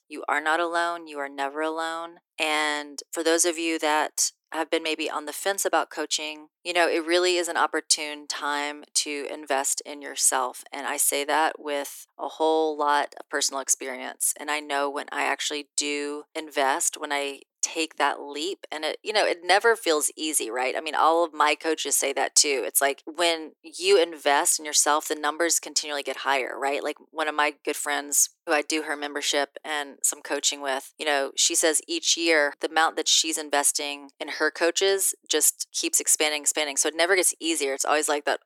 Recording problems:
thin; somewhat; fading below 300 Hz

